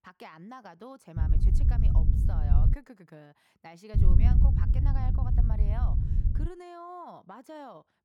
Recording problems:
wind noise on the microphone; heavy; from 1 to 2.5 s and from 4 to 6.5 s; 1 dB above the speech

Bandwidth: 18 kHz